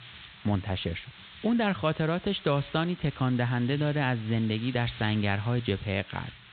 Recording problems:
high frequencies cut off; severe; nothing above 4 kHz
hiss; noticeable; throughout; 15 dB below the speech

